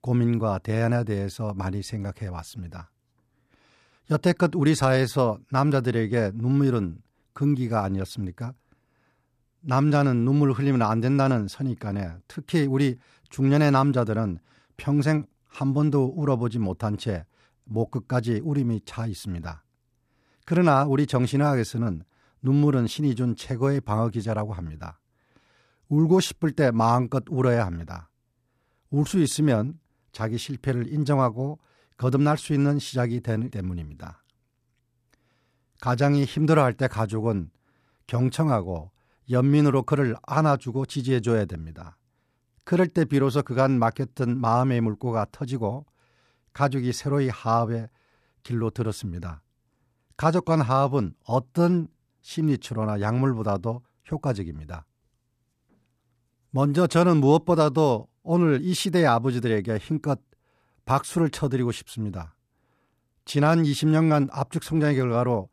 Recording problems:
none

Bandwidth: 14.5 kHz